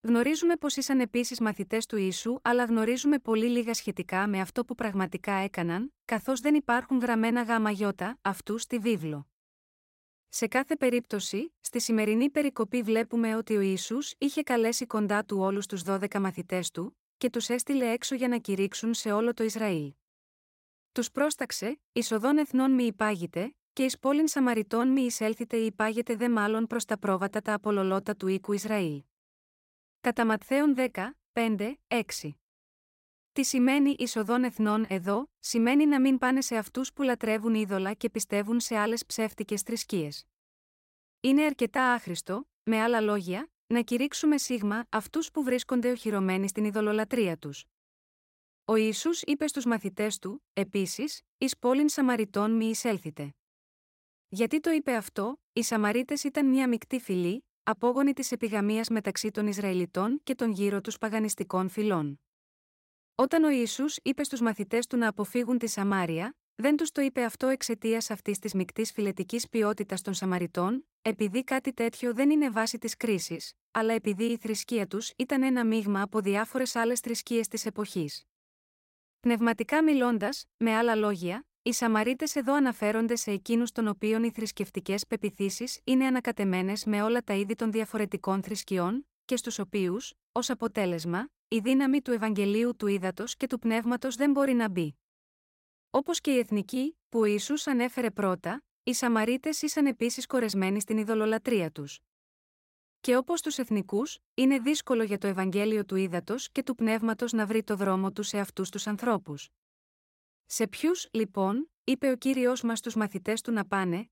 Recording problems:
none

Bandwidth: 16 kHz